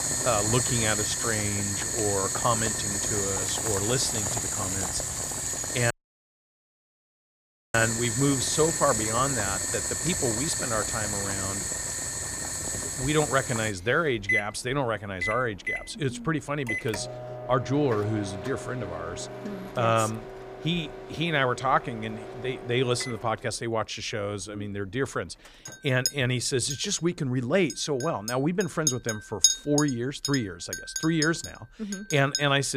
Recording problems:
household noises; loud; throughout; as loud as the speech
audio cutting out; at 6 s for 2 s
abrupt cut into speech; at the end

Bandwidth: 15 kHz